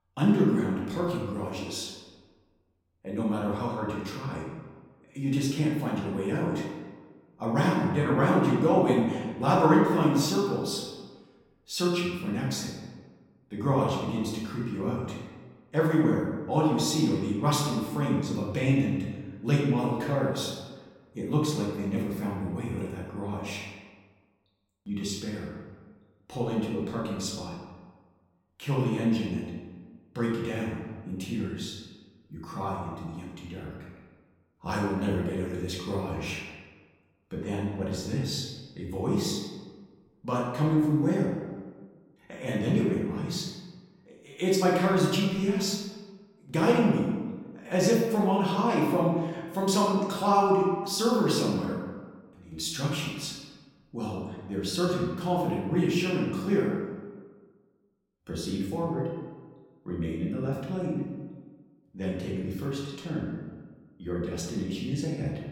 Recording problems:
off-mic speech; far
room echo; noticeable; dies away in 1.2 s

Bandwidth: 17 kHz